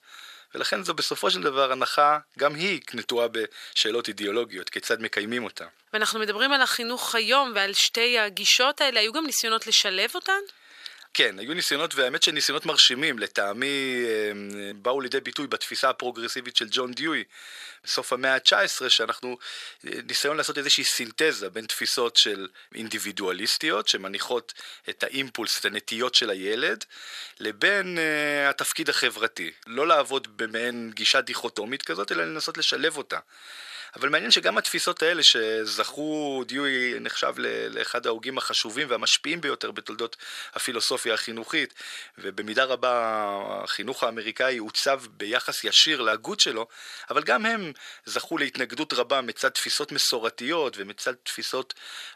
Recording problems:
thin; very; fading below 500 Hz

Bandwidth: 14.5 kHz